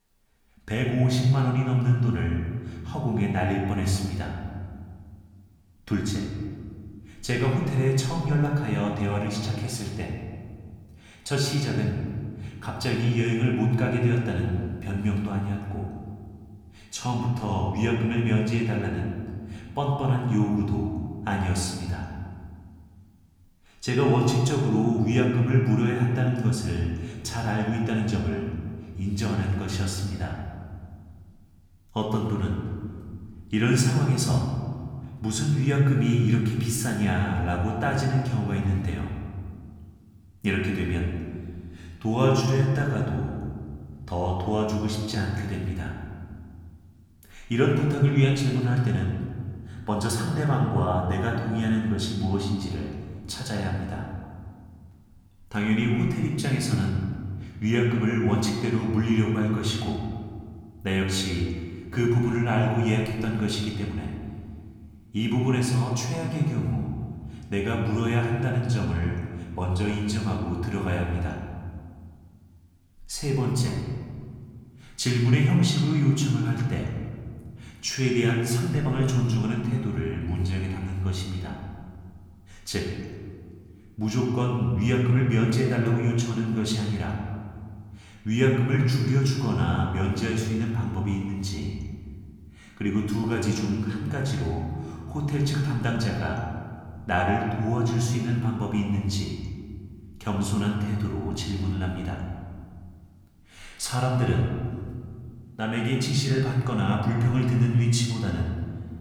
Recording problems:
room echo; noticeable; dies away in 1.7 s
off-mic speech; somewhat distant

